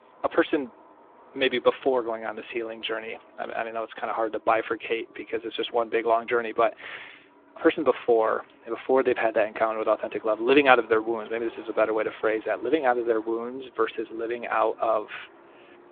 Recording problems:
phone-call audio; nothing above 3.5 kHz
traffic noise; faint; throughout; 25 dB below the speech

